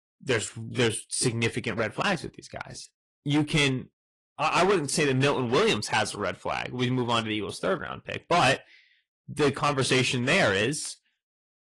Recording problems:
distortion; heavy; 7% of the sound clipped
garbled, watery; slightly; nothing above 10 kHz

